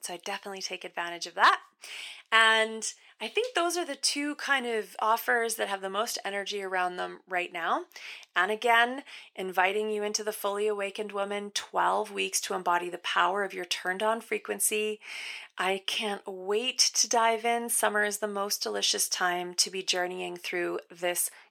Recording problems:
thin; very; fading below 500 Hz

